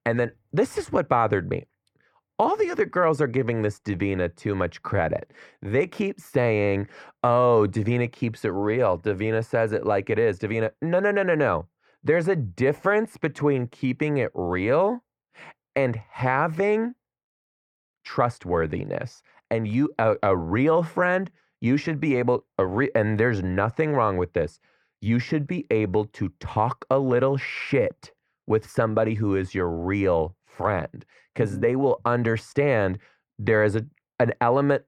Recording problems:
muffled; very; fading above 3.5 kHz

